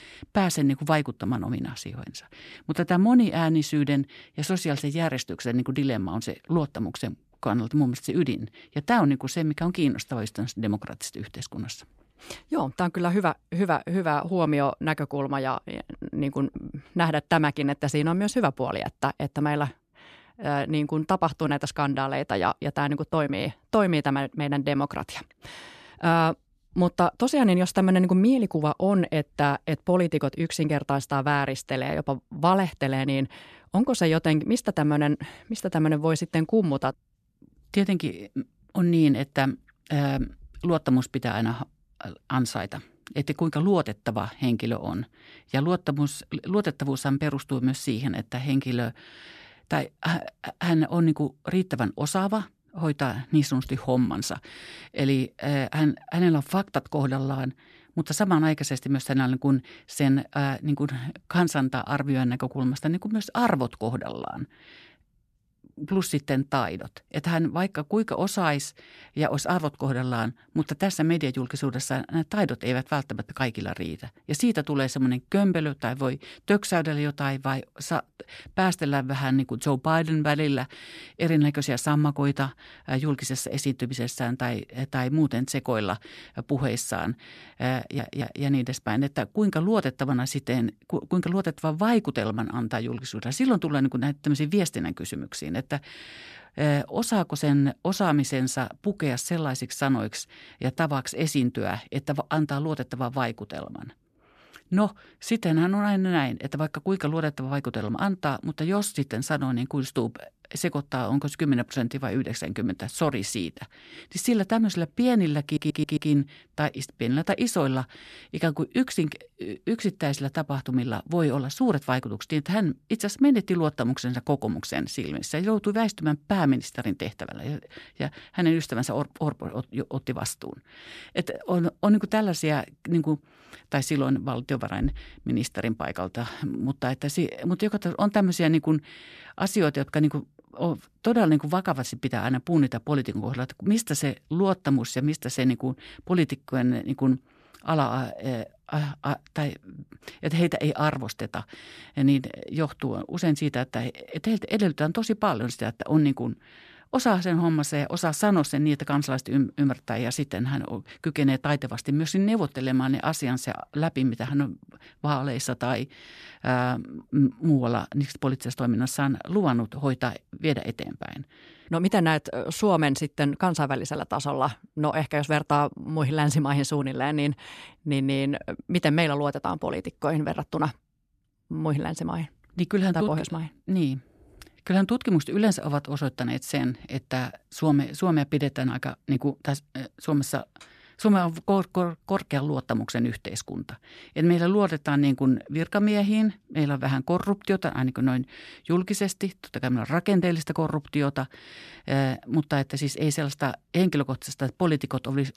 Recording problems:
audio stuttering; at 1:28 and at 1:55

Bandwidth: 14 kHz